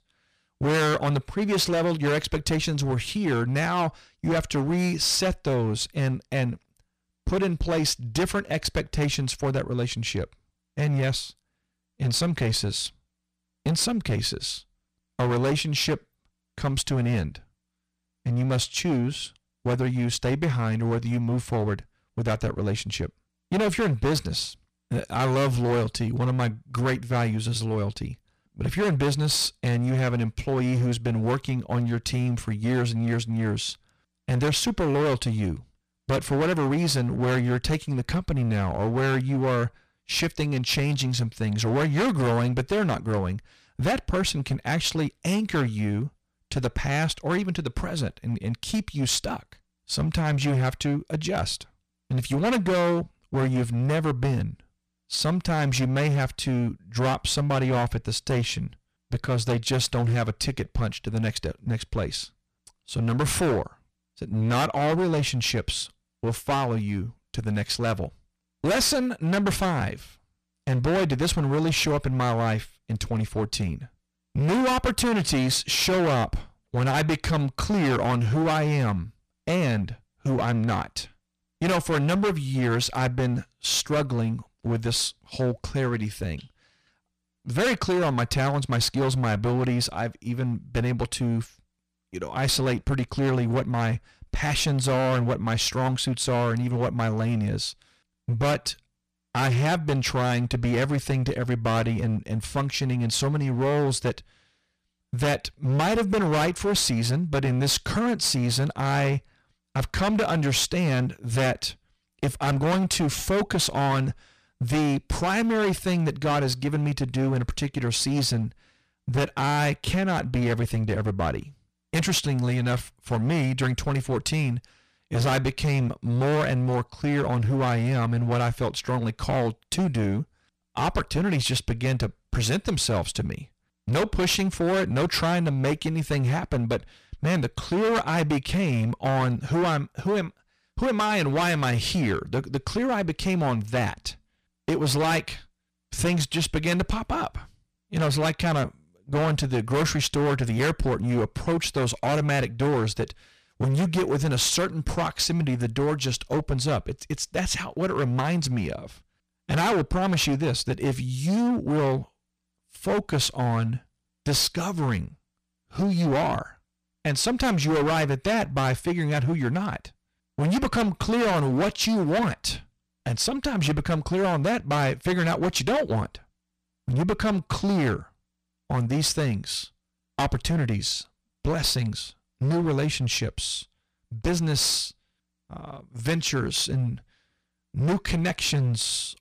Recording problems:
distortion; heavy; 18% of the sound clipped

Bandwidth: 14.5 kHz